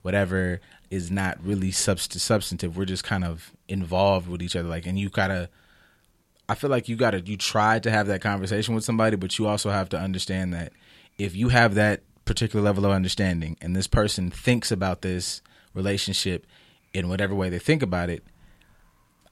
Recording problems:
none

